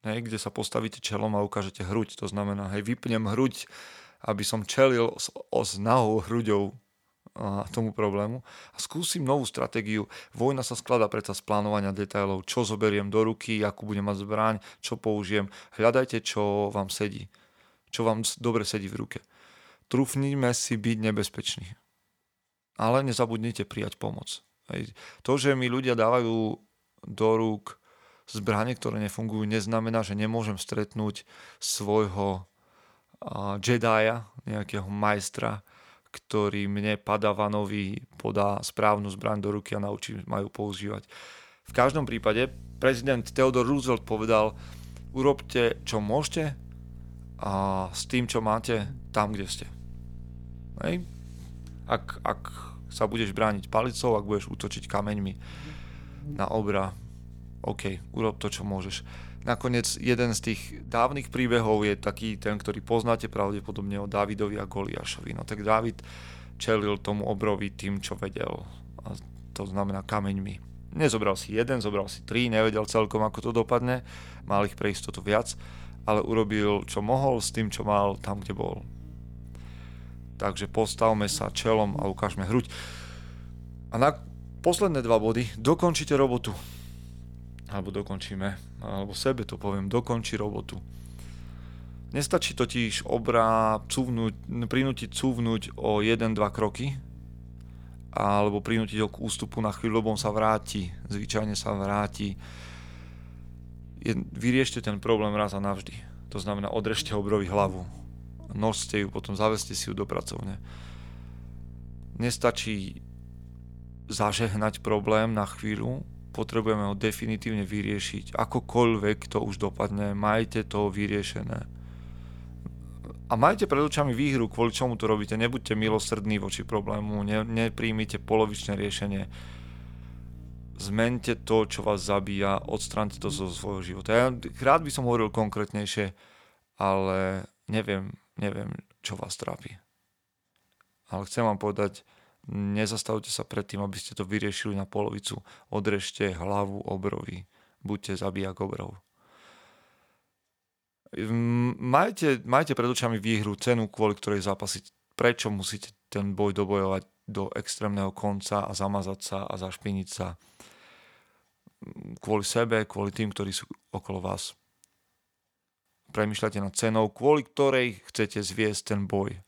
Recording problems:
electrical hum; faint; from 42 s to 2:16; 60 Hz, 30 dB below the speech

